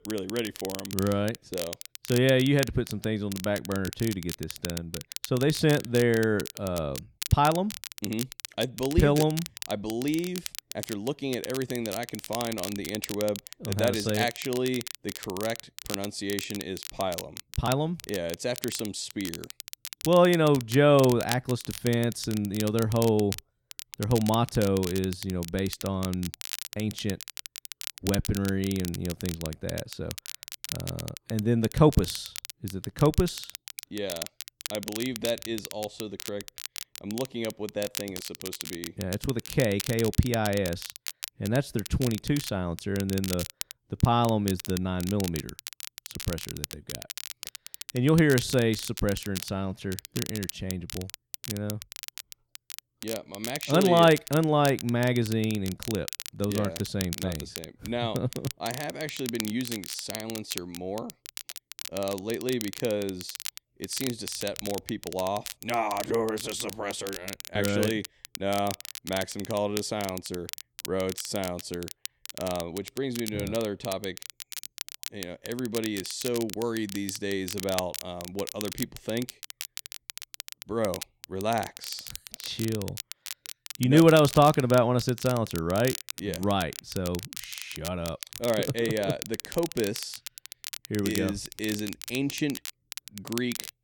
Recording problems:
crackle, like an old record; loud; 10 dB below the speech

